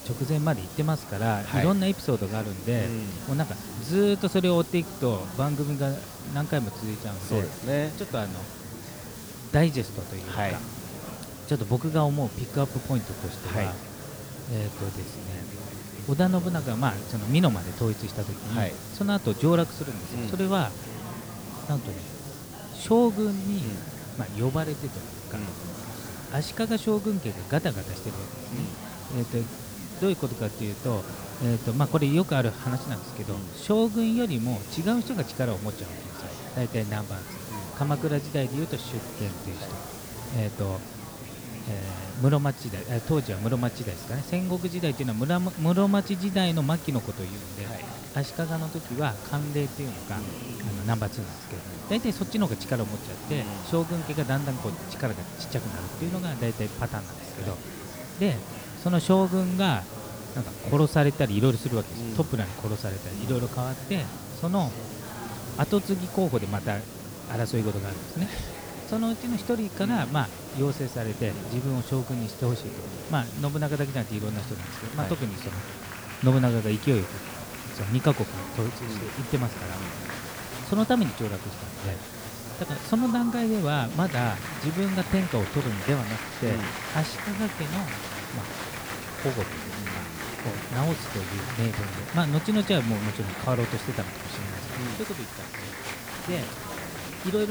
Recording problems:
murmuring crowd; noticeable; throughout; 10 dB below the speech
hiss; noticeable; throughout; 15 dB below the speech
abrupt cut into speech; at the end

